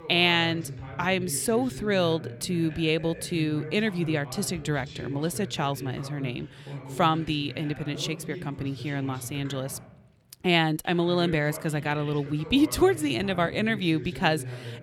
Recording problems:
voice in the background; noticeable; throughout; 15 dB below the speech

